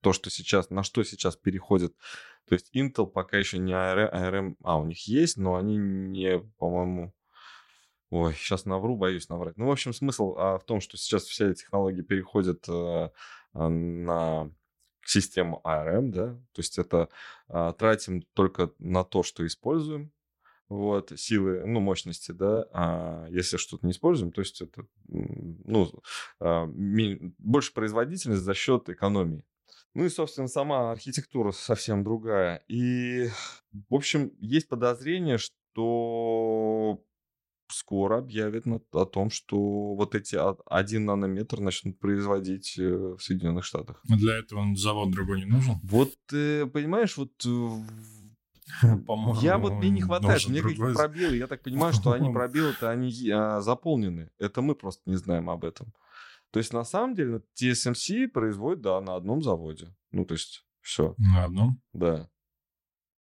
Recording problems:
none

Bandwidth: 16 kHz